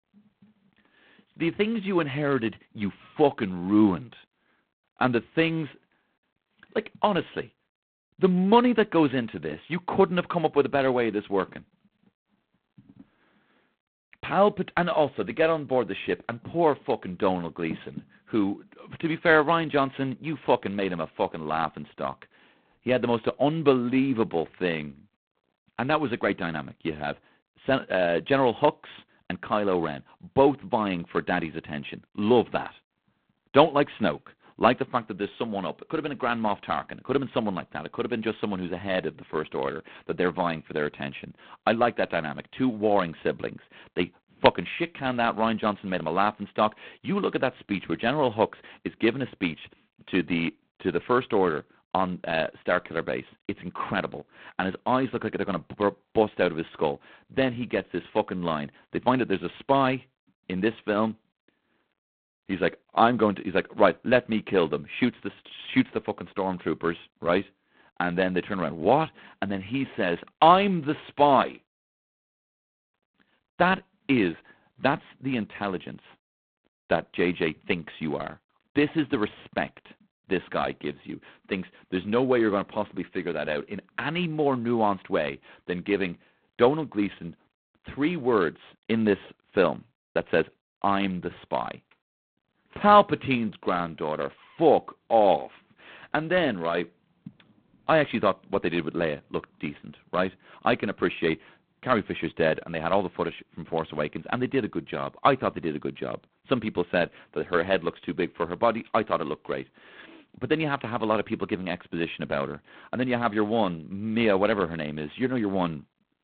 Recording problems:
phone-call audio; poor line; nothing above 4 kHz

